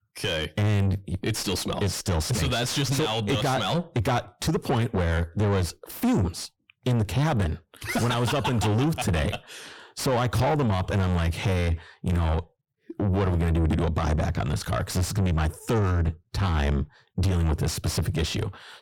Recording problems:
distortion; heavy; 6 dB below the speech

